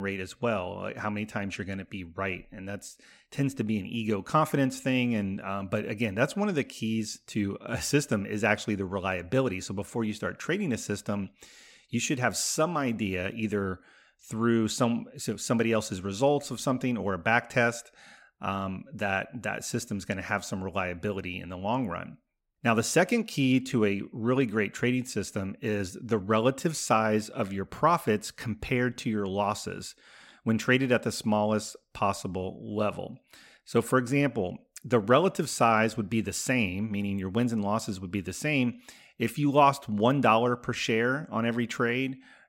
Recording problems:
abrupt cut into speech; at the start

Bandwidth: 16.5 kHz